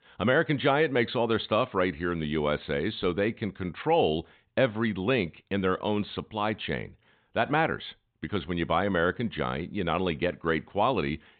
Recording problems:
high frequencies cut off; severe; nothing above 4 kHz

